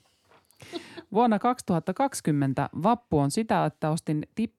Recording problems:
none

